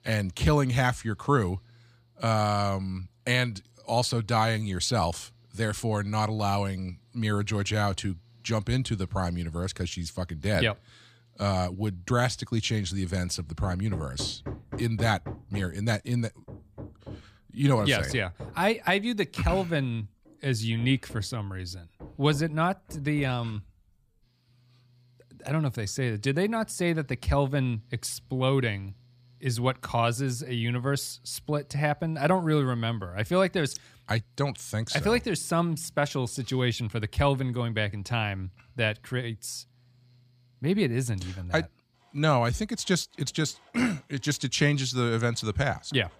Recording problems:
machinery noise; faint; throughout; 20 dB below the speech

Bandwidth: 15 kHz